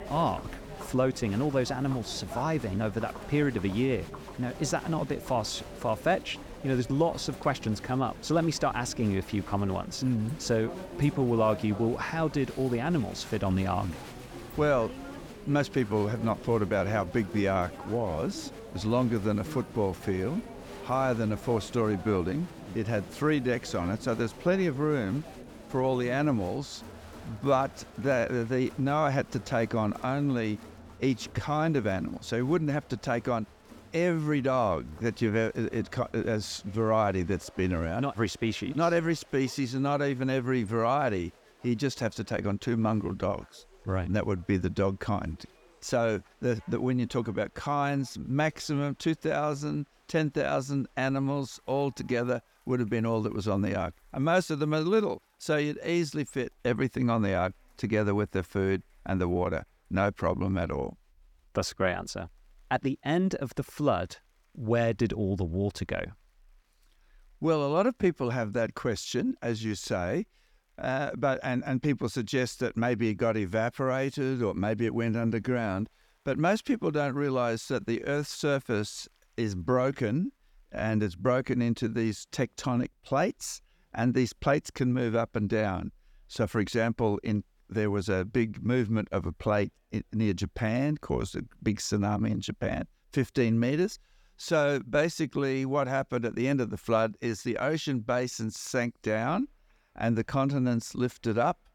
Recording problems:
crowd noise; noticeable; throughout; 15 dB below the speech

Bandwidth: 18.5 kHz